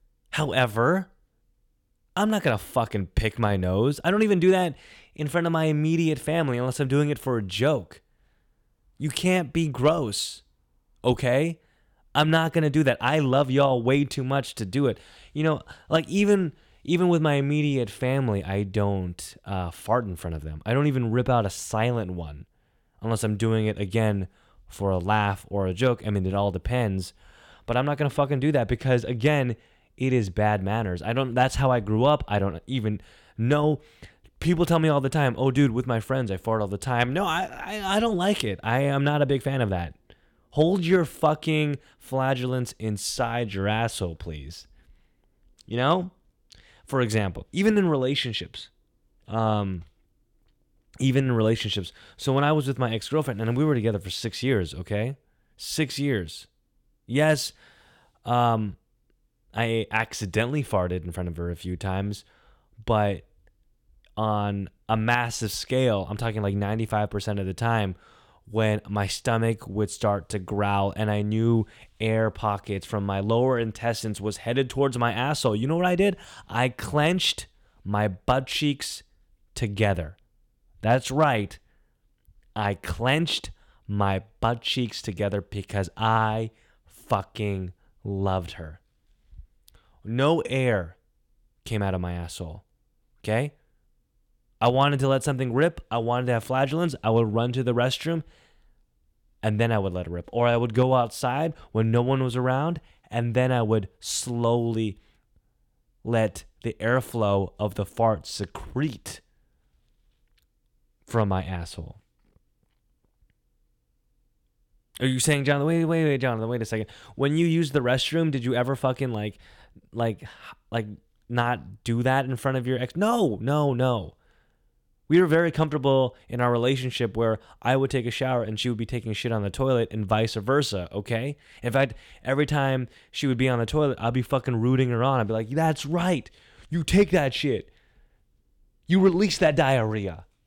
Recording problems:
none

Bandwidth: 17 kHz